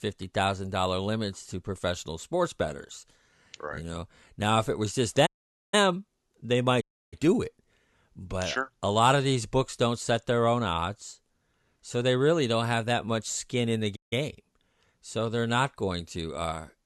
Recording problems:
audio cutting out; at 5.5 s, at 7 s and at 14 s

